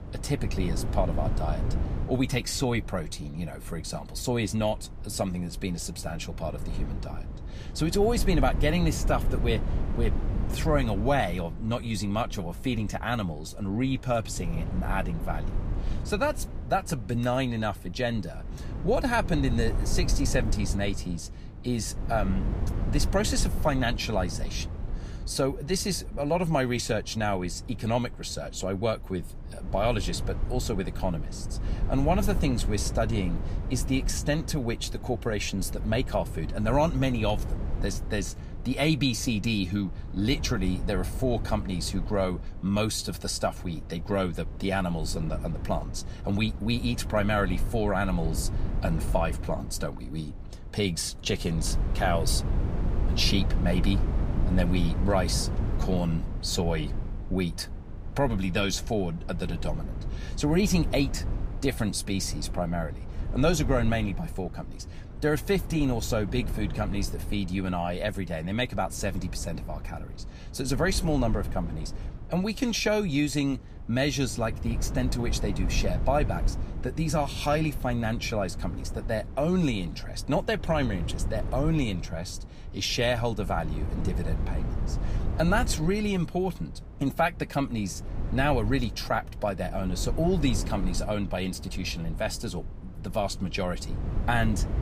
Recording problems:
wind noise on the microphone; occasional gusts; 15 dB below the speech

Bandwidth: 15 kHz